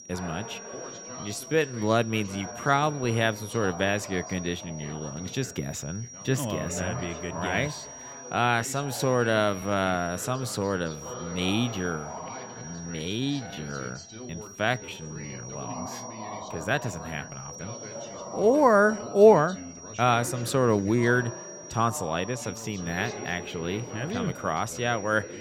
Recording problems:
high-pitched whine; noticeable; throughout; 5.5 kHz, 15 dB below the speech
background chatter; noticeable; throughout; 2 voices, 15 dB below the speech
uneven, jittery; strongly; from 1 to 24 s

